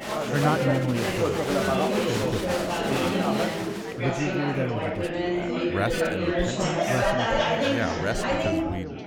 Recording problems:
chatter from many people; very loud; throughout; 5 dB above the speech

